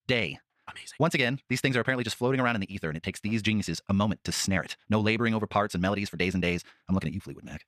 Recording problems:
wrong speed, natural pitch; too fast; 1.7 times normal speed

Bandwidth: 14.5 kHz